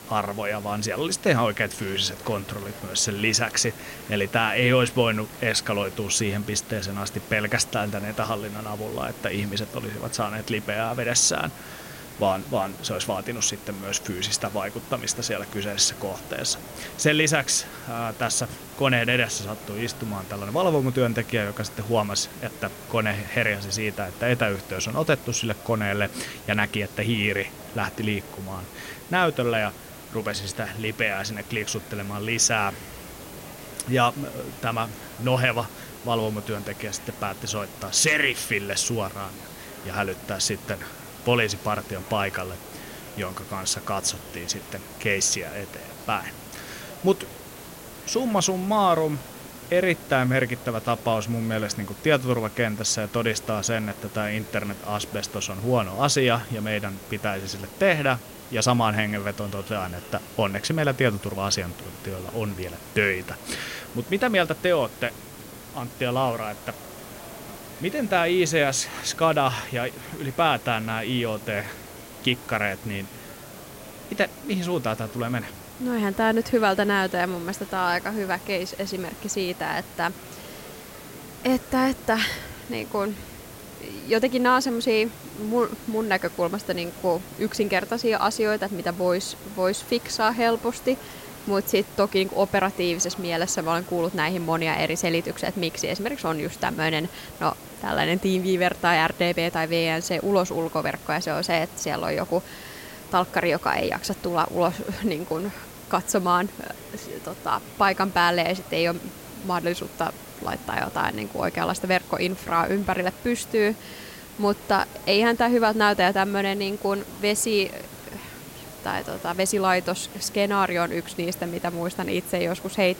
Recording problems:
hiss; noticeable; throughout; 15 dB below the speech
murmuring crowd; faint; throughout; 20 dB below the speech

